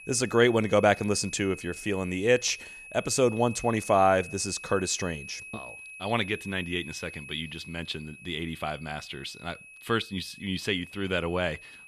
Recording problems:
high-pitched whine; noticeable; throughout; 2.5 kHz, 15 dB below the speech

